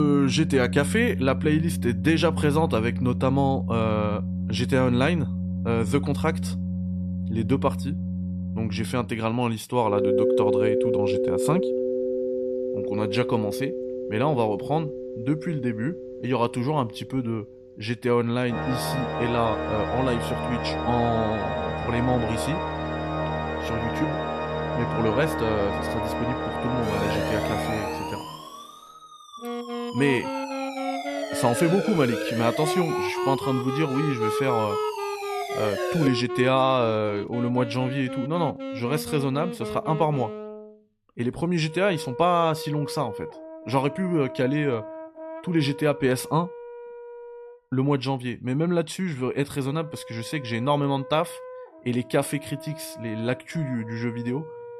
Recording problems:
background music; loud; throughout; 4 dB below the speech
abrupt cut into speech; at the start
siren; noticeable; from 27 to 36 s; peak 3 dB below the speech

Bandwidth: 13.5 kHz